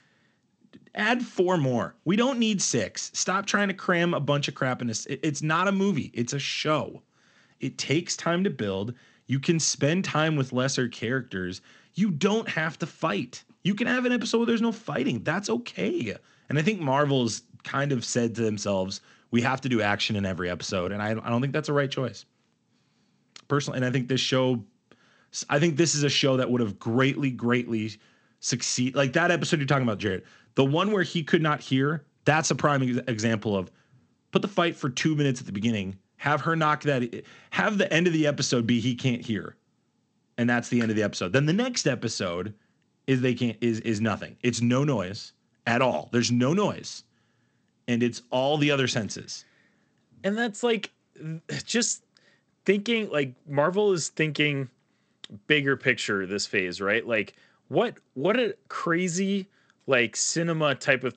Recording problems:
garbled, watery; slightly; nothing above 7.5 kHz

